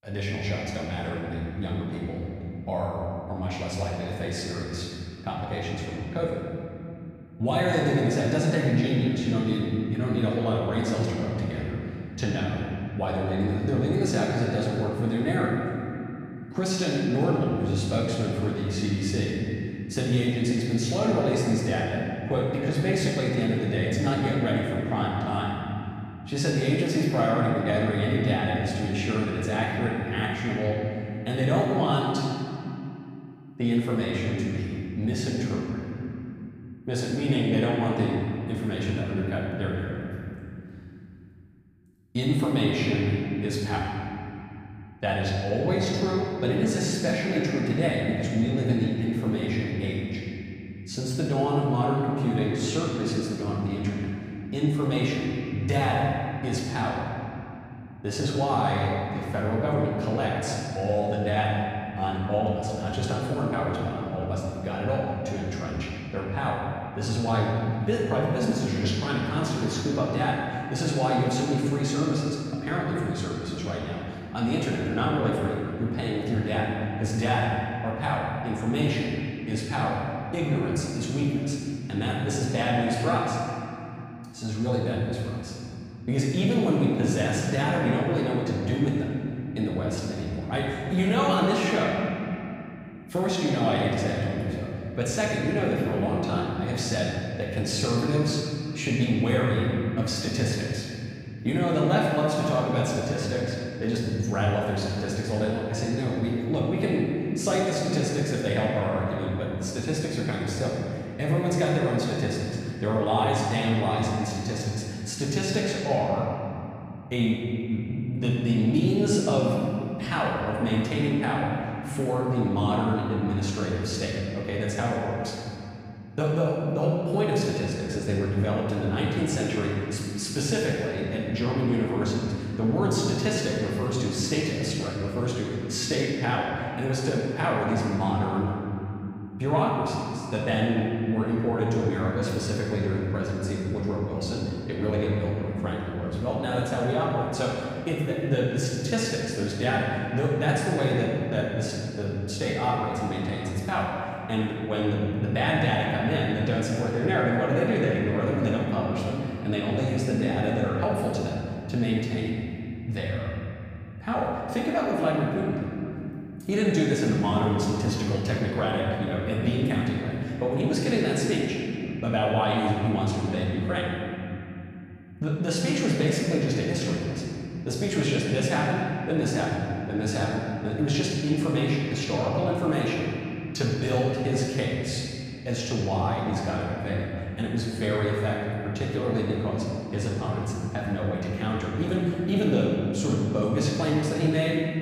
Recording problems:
room echo; strong; dies away in 2.9 s
off-mic speech; far

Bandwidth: 15.5 kHz